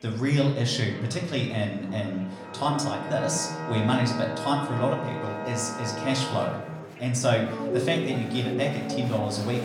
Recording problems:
room echo; slight; dies away in 0.6 s
off-mic speech; somewhat distant
background music; loud; from 2.5 s on; 6 dB below the speech
murmuring crowd; noticeable; throughout; 15 dB below the speech

